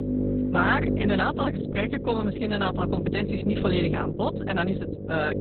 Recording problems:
garbled, watery; badly; nothing above 4 kHz
electrical hum; loud; throughout; 50 Hz, 6 dB below the speech
background music; loud; throughout; 4 dB below the speech

